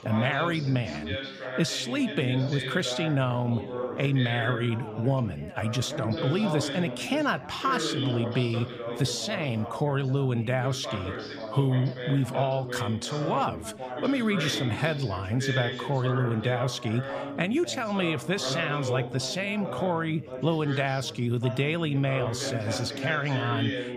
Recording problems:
background chatter; loud; throughout; 3 voices, 7 dB below the speech

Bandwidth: 15 kHz